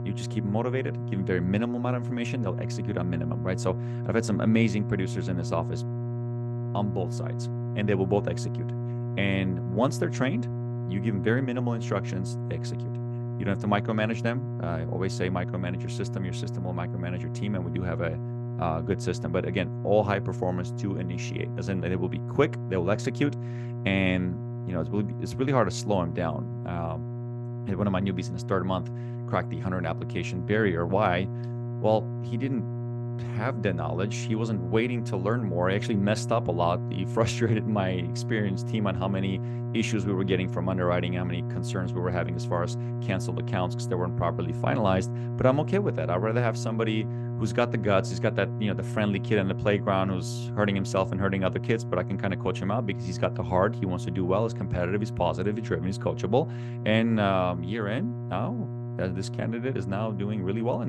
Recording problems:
electrical hum; noticeable; throughout; 60 Hz, 10 dB below the speech
abrupt cut into speech; at the end

